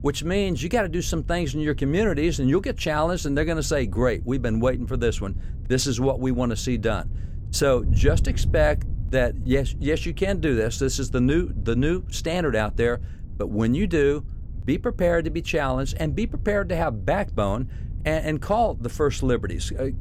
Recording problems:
wind noise on the microphone; occasional gusts; 20 dB below the speech

